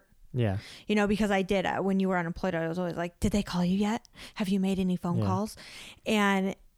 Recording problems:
none

